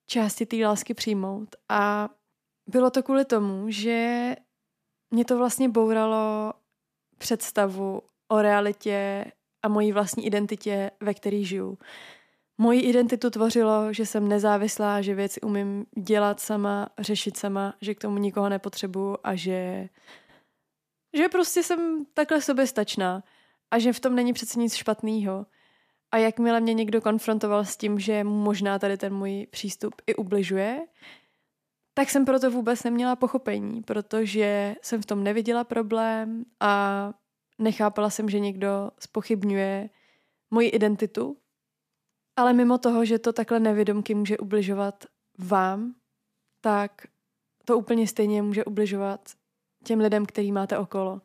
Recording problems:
none

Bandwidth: 14.5 kHz